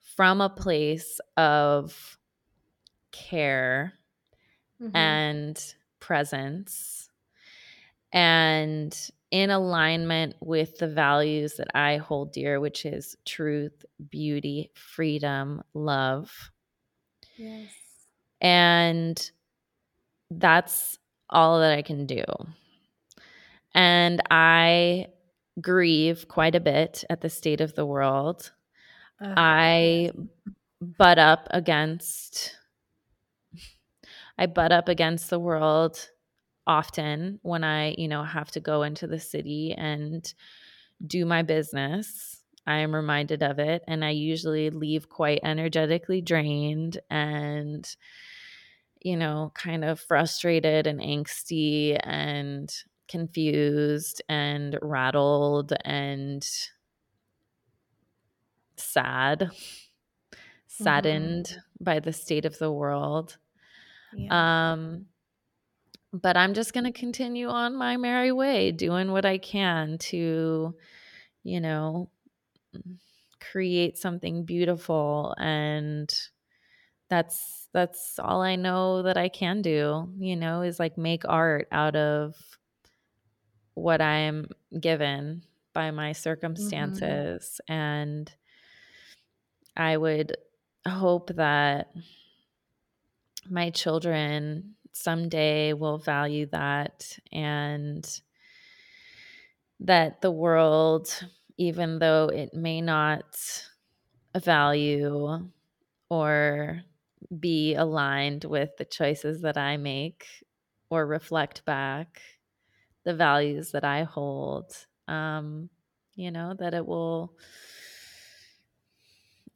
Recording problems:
none

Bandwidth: 17.5 kHz